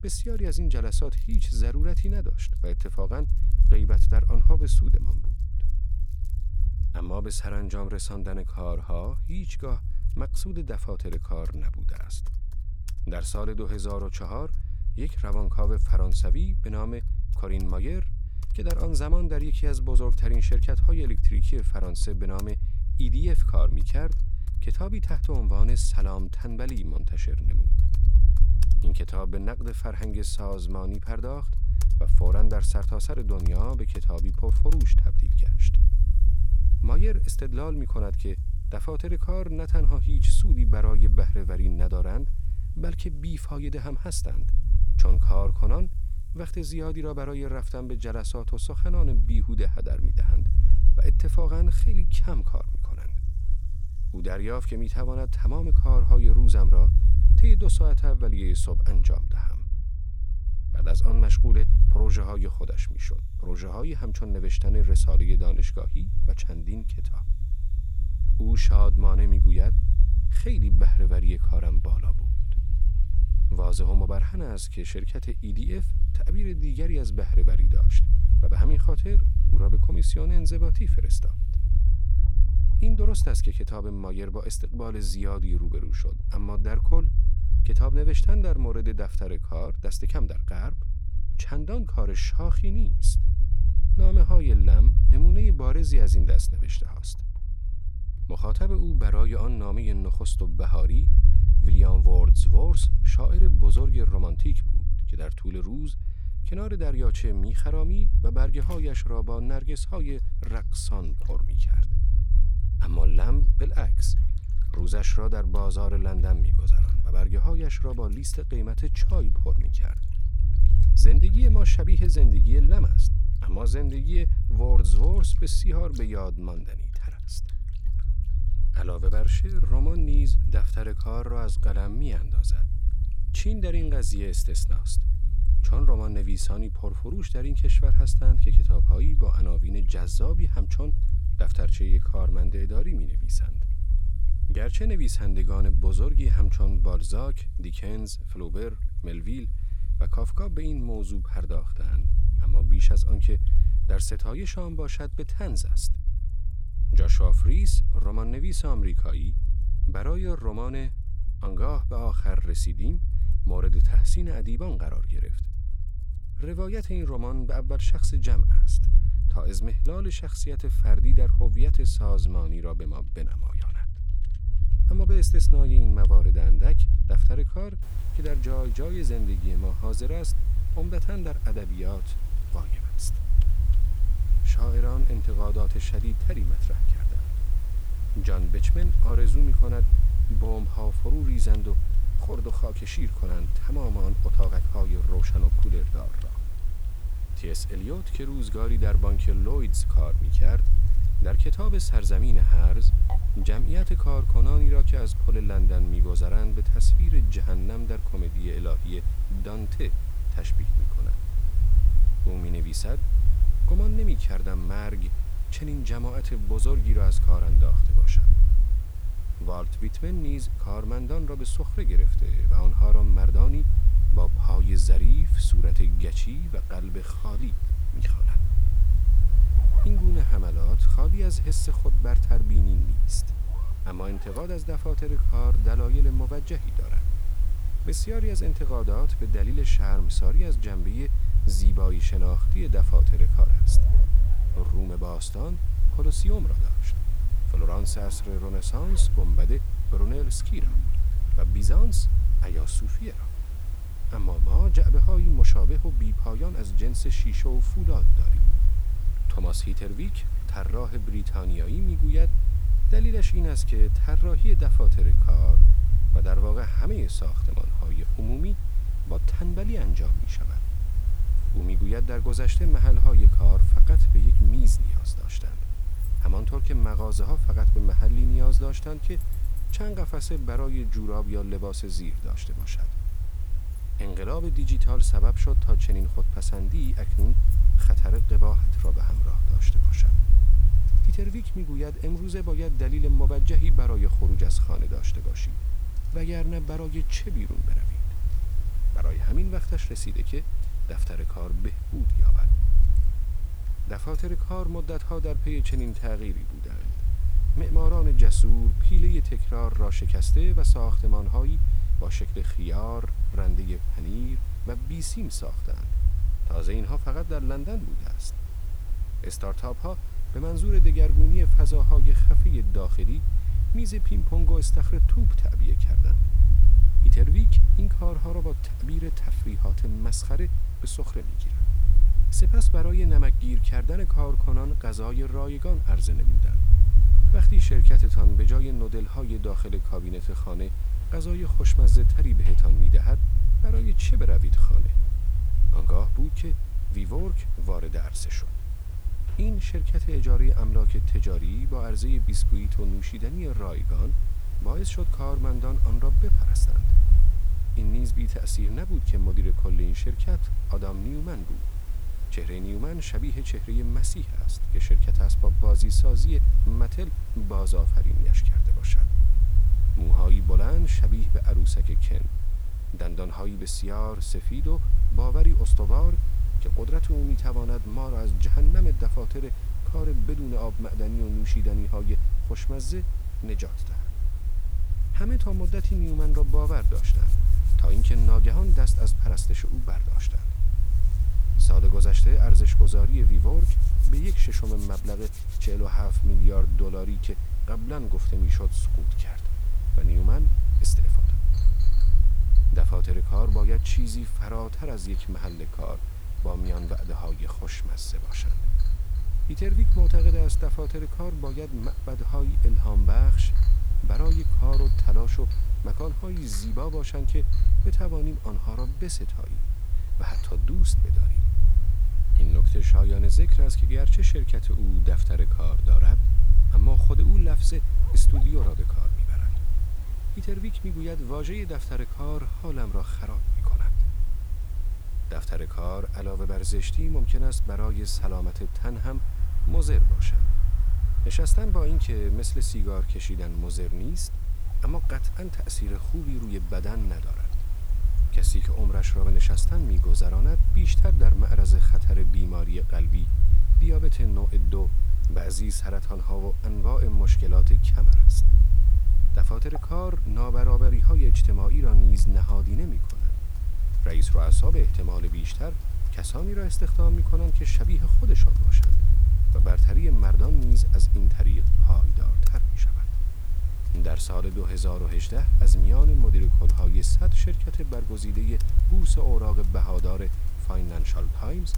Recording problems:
low rumble; loud; throughout; 7 dB below the speech
hiss; noticeable; from 2:58 on; 15 dB below the speech
household noises; faint; throughout; 20 dB below the speech

